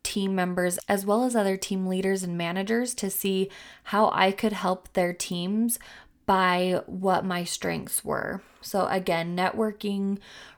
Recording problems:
none

